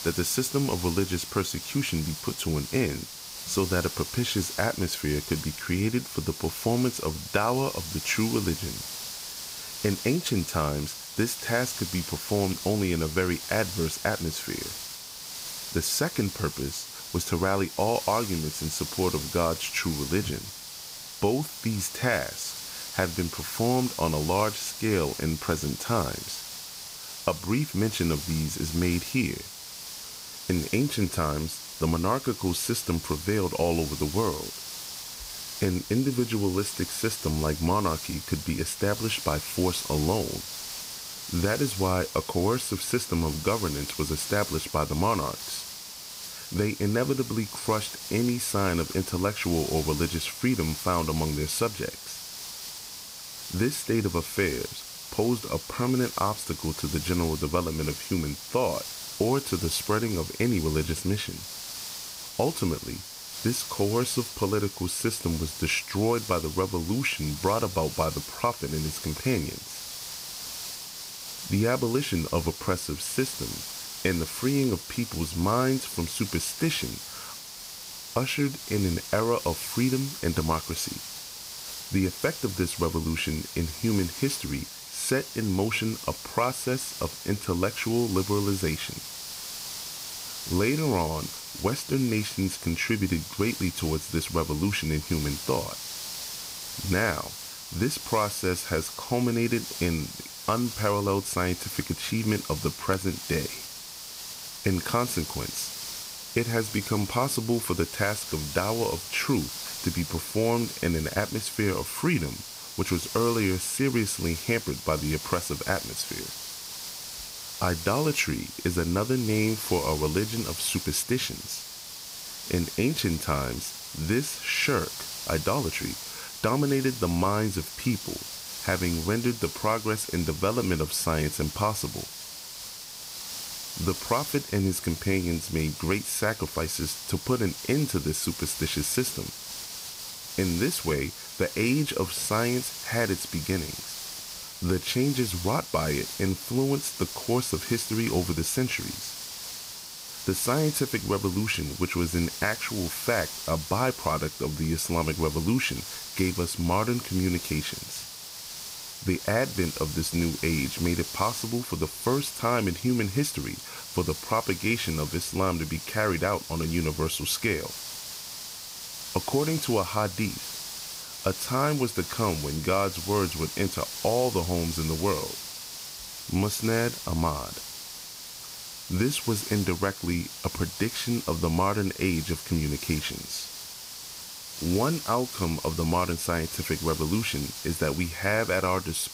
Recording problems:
hiss; loud; throughout; 8 dB below the speech

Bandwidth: 15.5 kHz